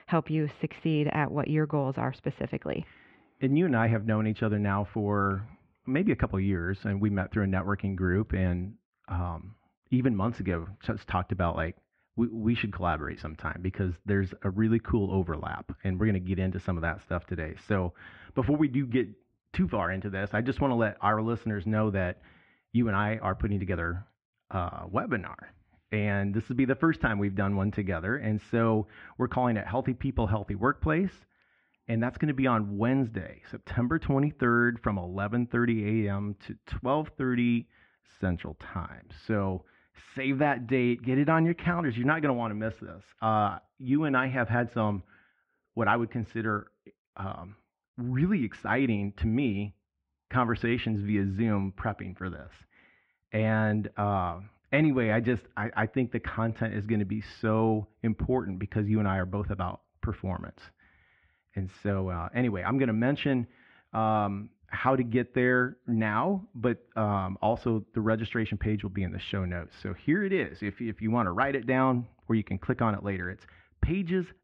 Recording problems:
muffled; very; fading above 2.5 kHz

